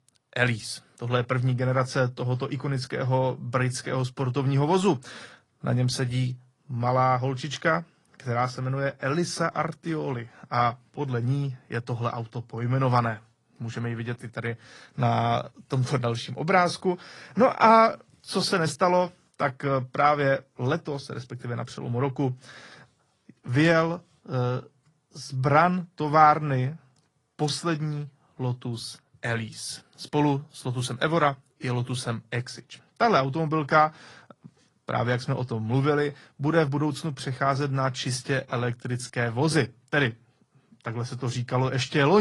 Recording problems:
garbled, watery; slightly; nothing above 10.5 kHz
abrupt cut into speech; at the end

